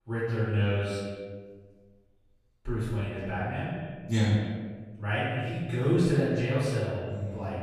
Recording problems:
room echo; strong; dies away in 1.3 s
off-mic speech; far
echo of what is said; noticeable; throughout; 120 ms later, 15 dB below the speech

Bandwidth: 15 kHz